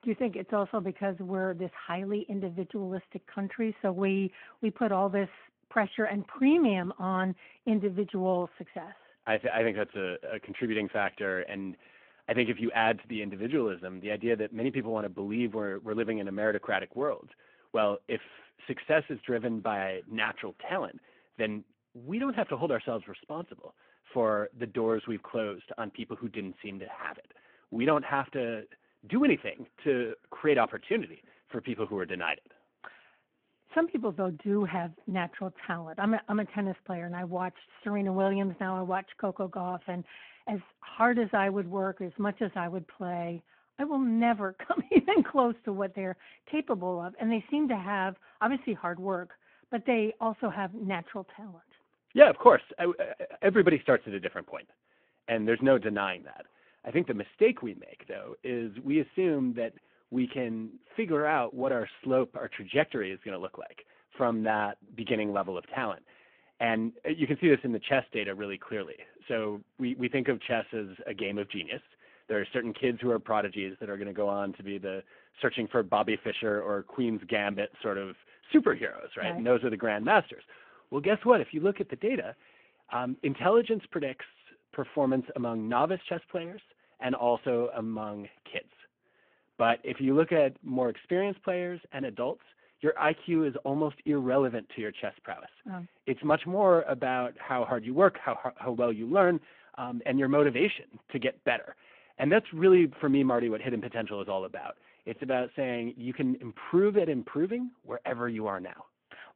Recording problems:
phone-call audio

